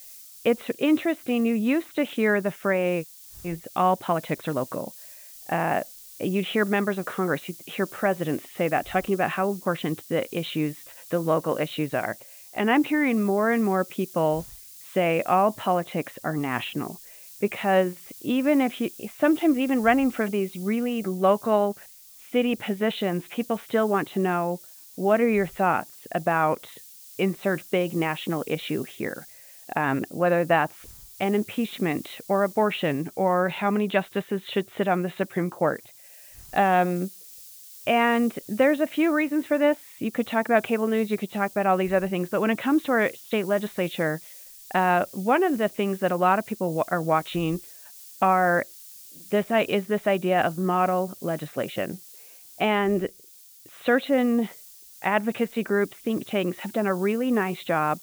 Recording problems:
high frequencies cut off; severe; nothing above 4 kHz
hiss; noticeable; throughout; 20 dB below the speech

